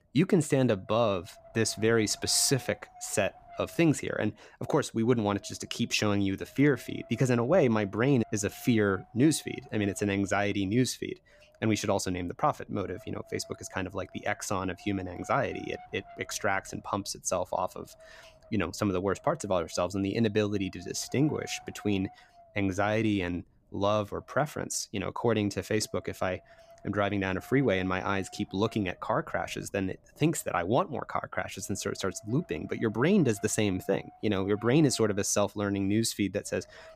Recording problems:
wind noise on the microphone; occasional gusts; 20 dB below the speech

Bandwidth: 15 kHz